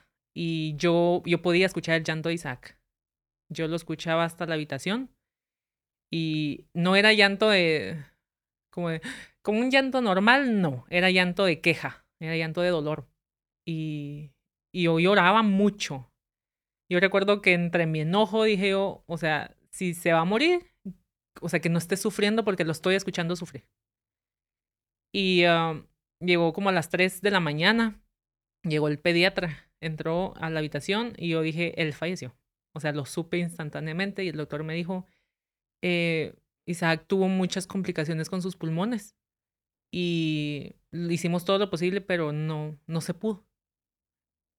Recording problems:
uneven, jittery; strongly; from 1.5 to 38 s

